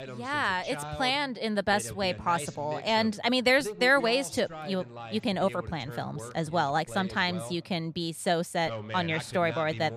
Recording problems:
voice in the background; noticeable; throughout; 15 dB below the speech

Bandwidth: 15 kHz